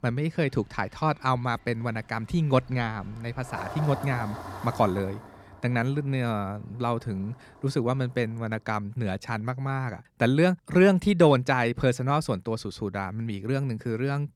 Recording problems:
traffic noise; noticeable; until 8.5 s; 15 dB below the speech

